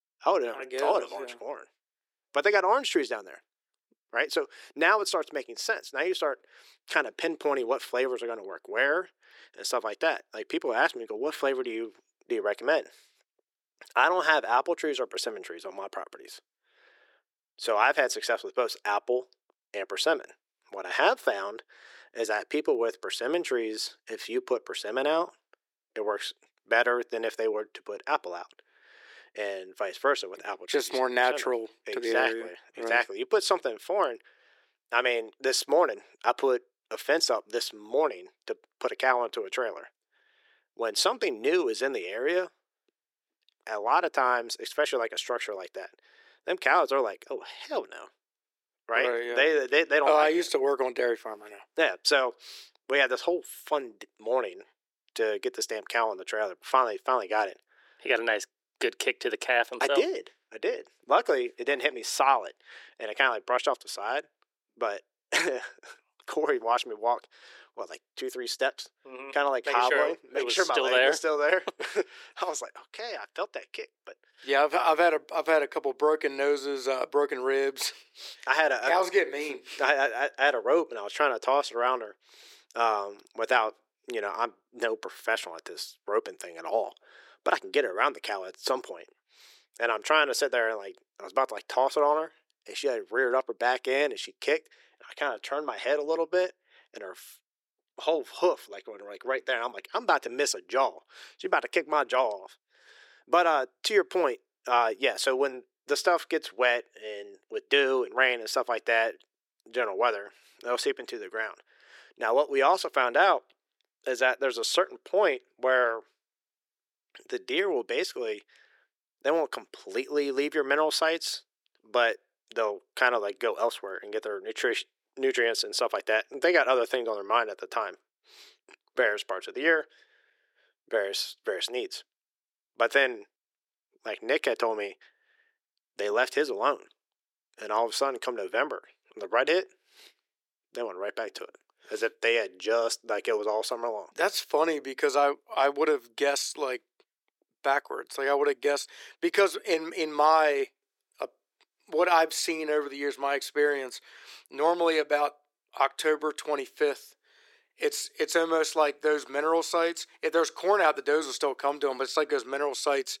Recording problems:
thin; very; fading below 350 Hz

